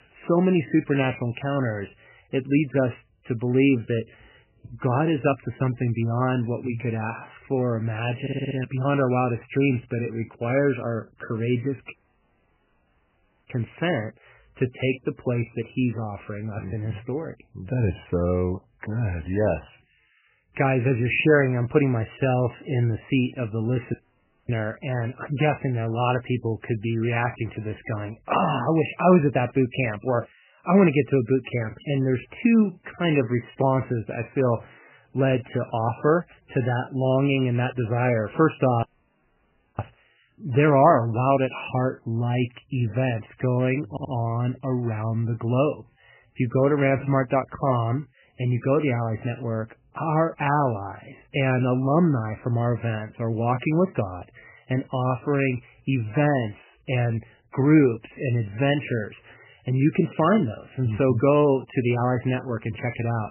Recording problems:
garbled, watery; badly; nothing above 3 kHz
audio stuttering; at 8 s and at 44 s
audio cutting out; at 12 s for 1.5 s, at 24 s for 0.5 s and at 39 s for 1 s

